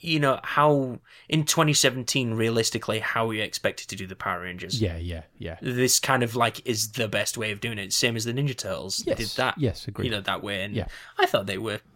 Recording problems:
none

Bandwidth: 16 kHz